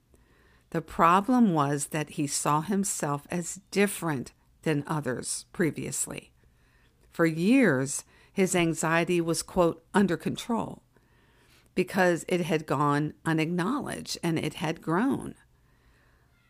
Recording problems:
none

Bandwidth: 15 kHz